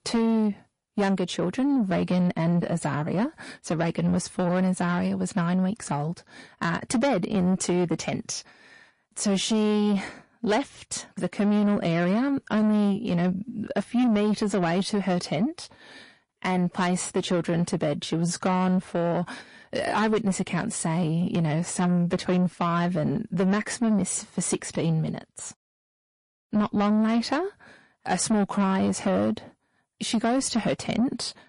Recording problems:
distortion; slight; 10 dB below the speech
garbled, watery; slightly; nothing above 10.5 kHz

